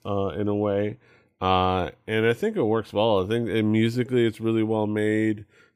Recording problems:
none

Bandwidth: 15 kHz